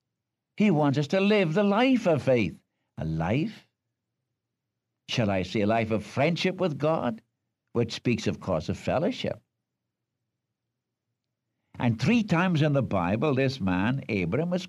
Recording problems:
none

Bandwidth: 15 kHz